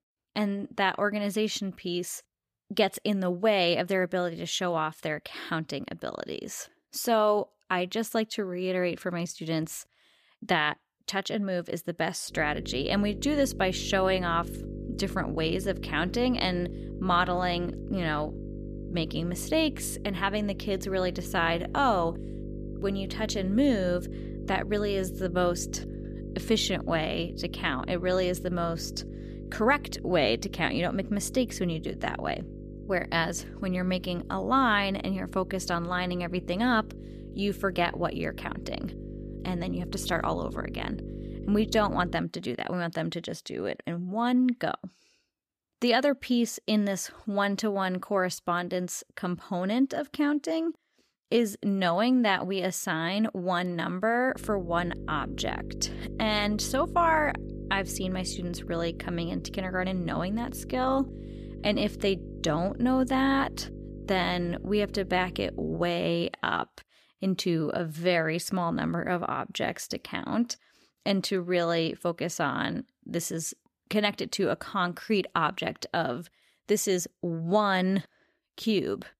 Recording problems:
electrical hum; noticeable; from 12 to 42 s and from 54 s to 1:06; 50 Hz, 15 dB below the speech

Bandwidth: 14.5 kHz